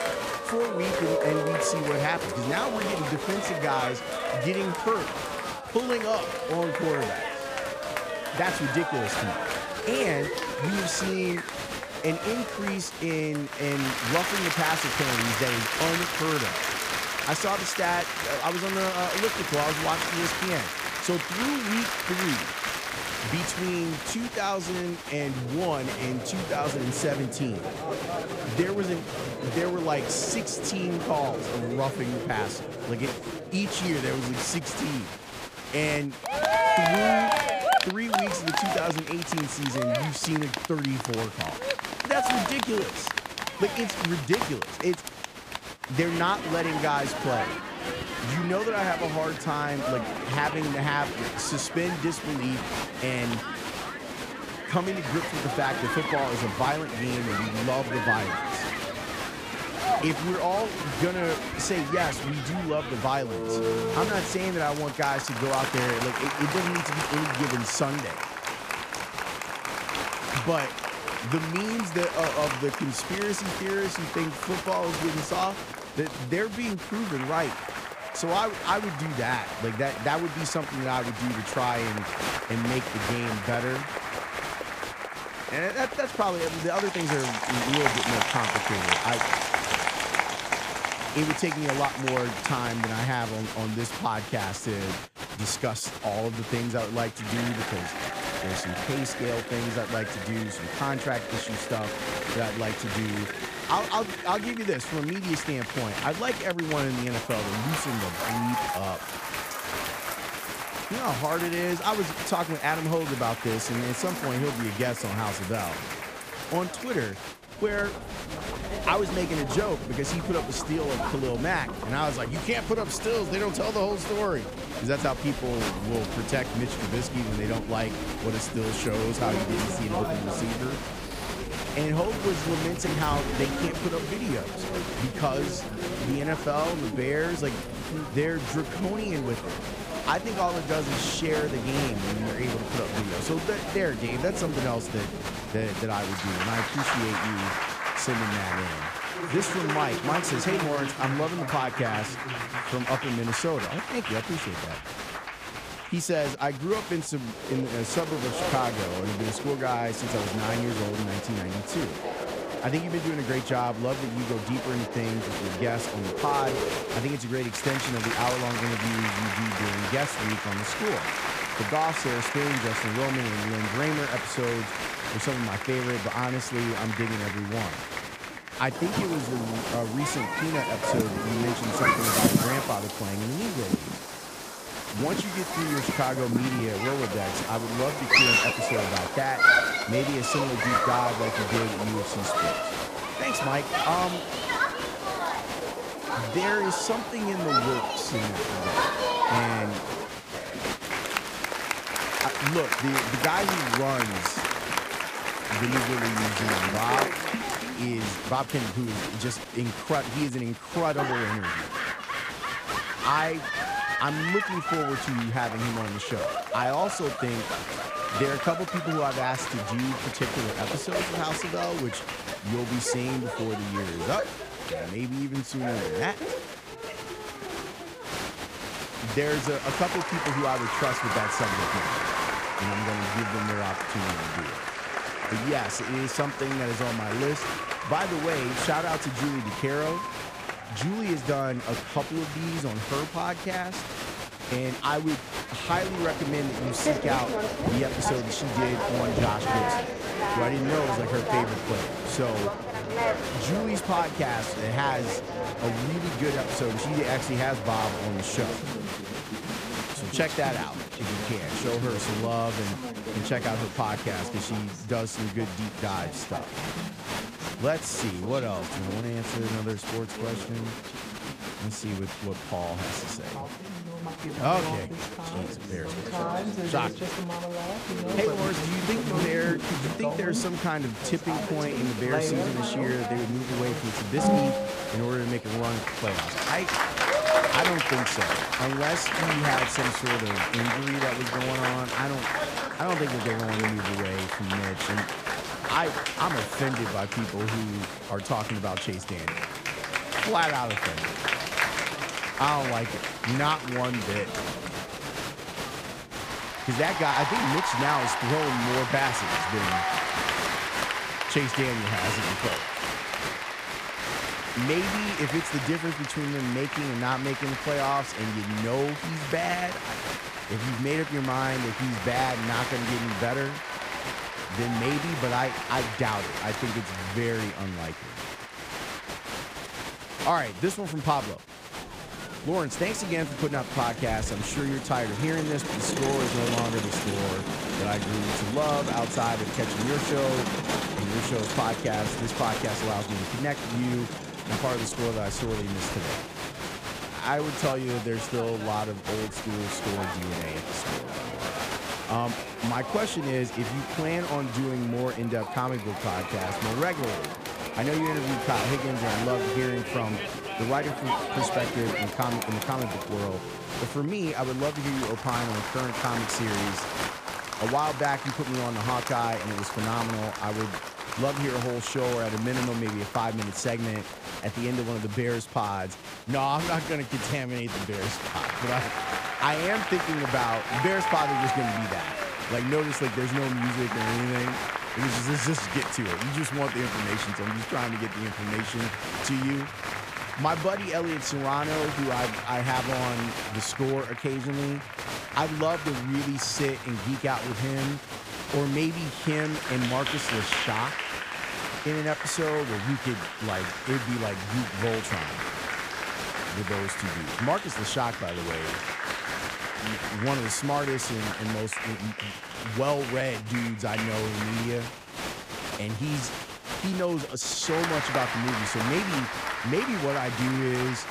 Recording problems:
crowd noise; loud; throughout; 1 dB below the speech

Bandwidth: 15 kHz